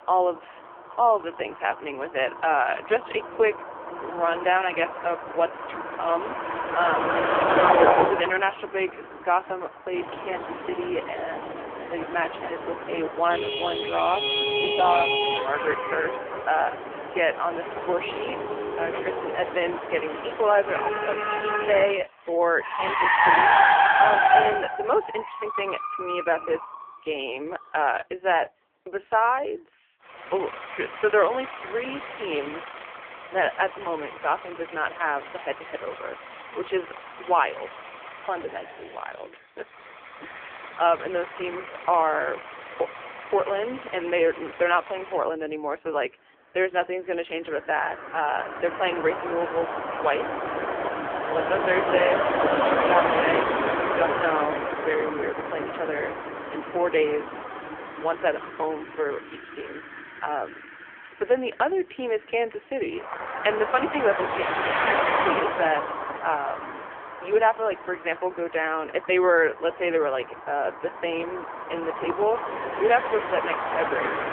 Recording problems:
phone-call audio; poor line; nothing above 3 kHz
traffic noise; loud; throughout; as loud as the speech

